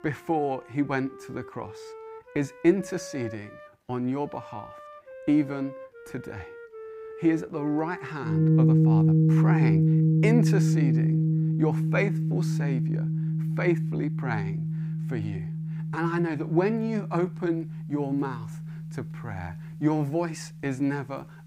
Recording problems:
background music; very loud; throughout; 4 dB above the speech

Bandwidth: 15.5 kHz